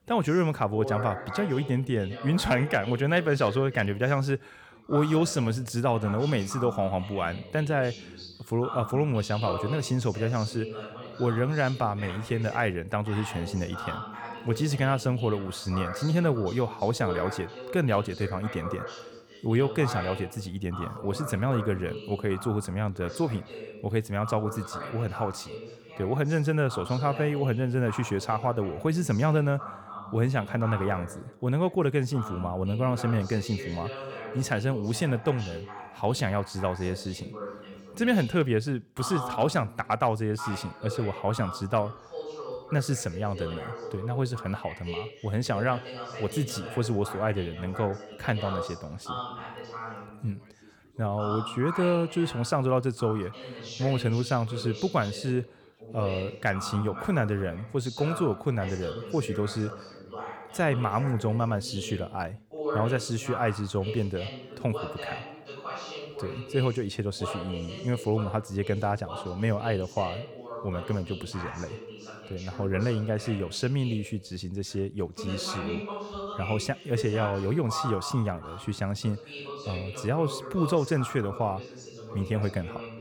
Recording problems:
background chatter; noticeable; throughout; 2 voices, 10 dB below the speech

